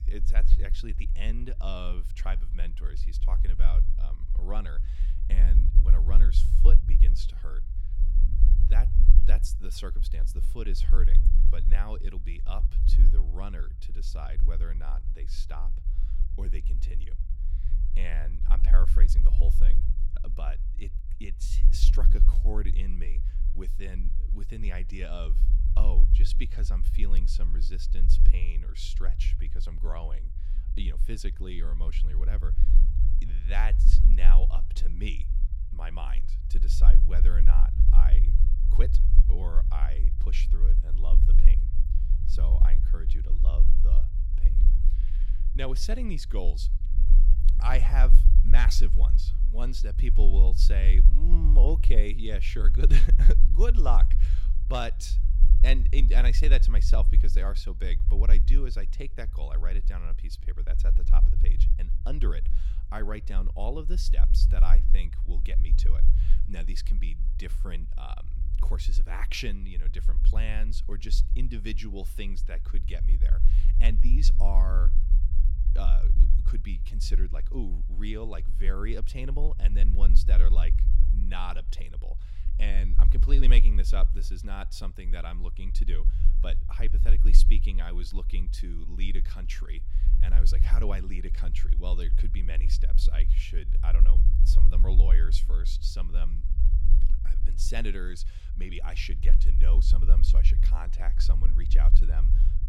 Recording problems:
low rumble; loud; throughout; 9 dB below the speech

